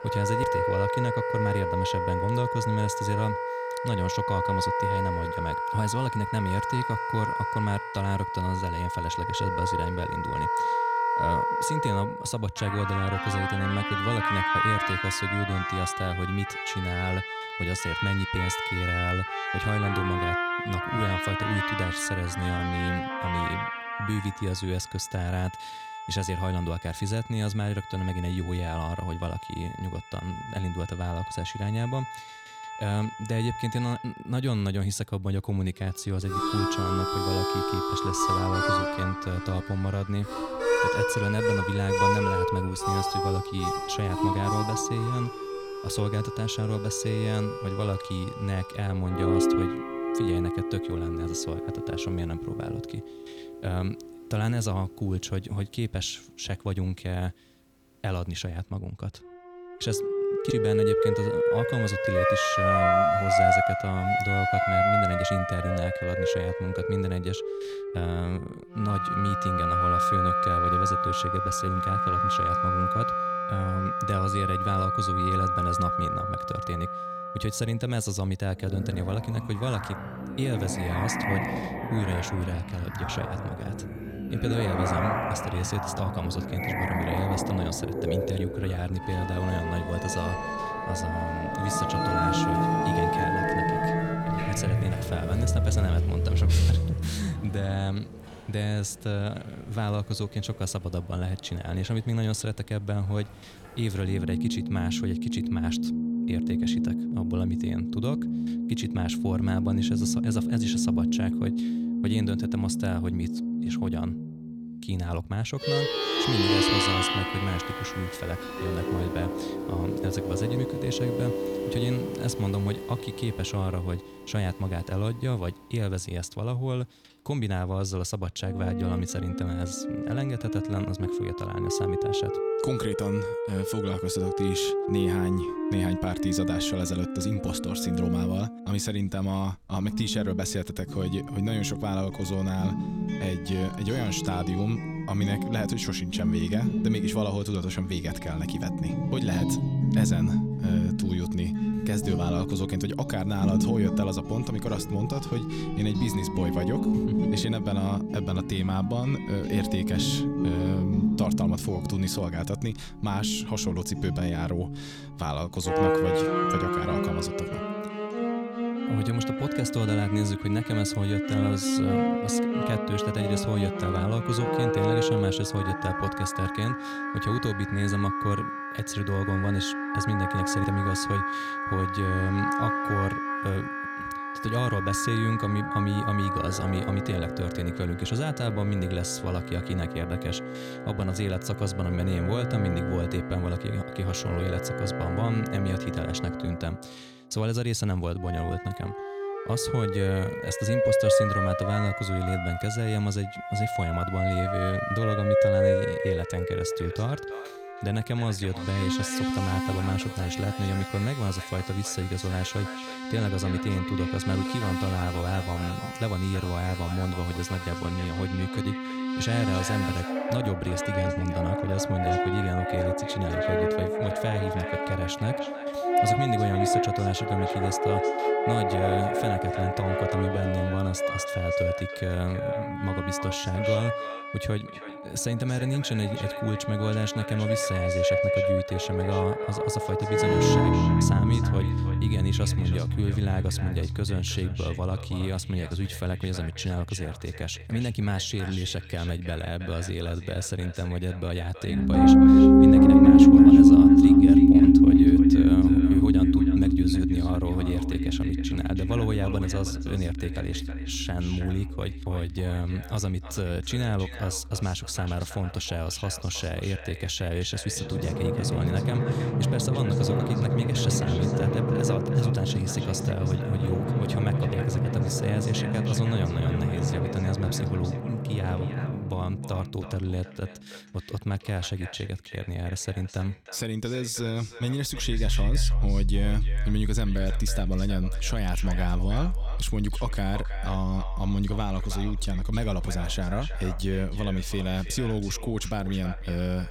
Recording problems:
echo of what is said; noticeable; from 3:27 on; 320 ms later, 15 dB below the speech
background music; very loud; throughout; 4 dB above the speech

